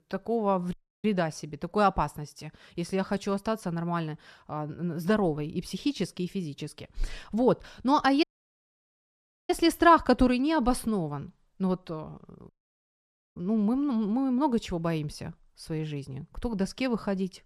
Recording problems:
audio cutting out; at 0.5 s, at 8 s for 1.5 s and at 12 s for 1 s

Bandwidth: 14 kHz